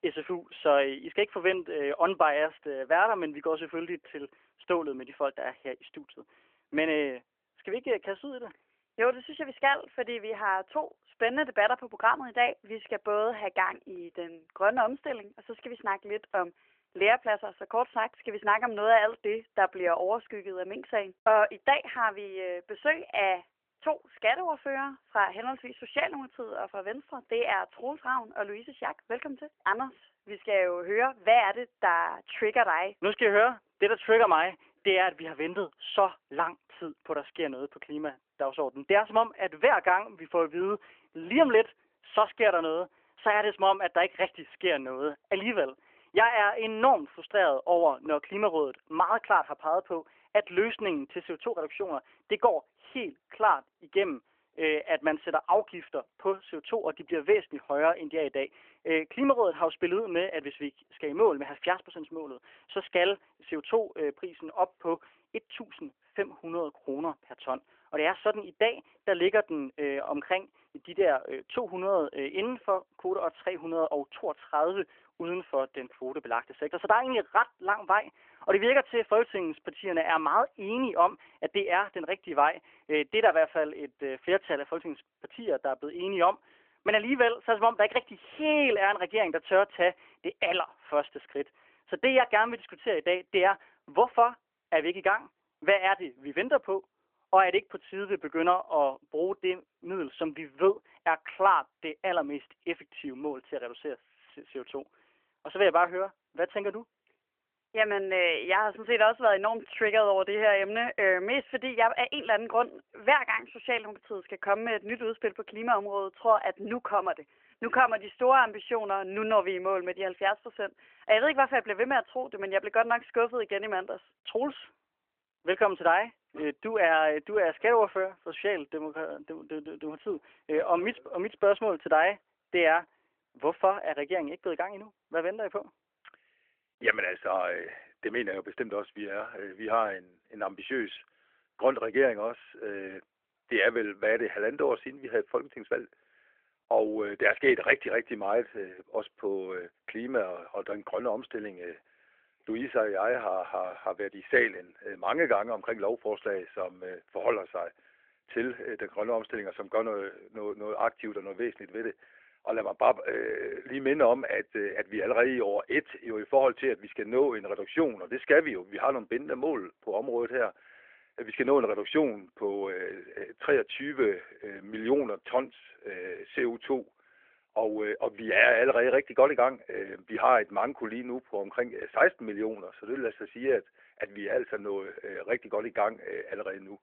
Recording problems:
phone-call audio; nothing above 3 kHz
muffled; very slightly; fading above 2.5 kHz

